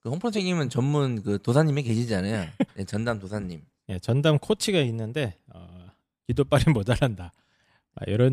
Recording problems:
abrupt cut into speech; at the end

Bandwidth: 15 kHz